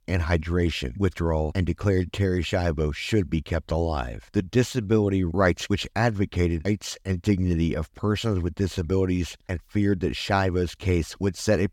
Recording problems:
none

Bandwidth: 17 kHz